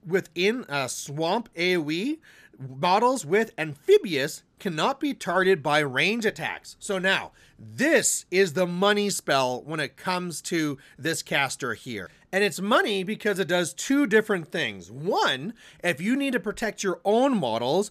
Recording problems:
none

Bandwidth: 14.5 kHz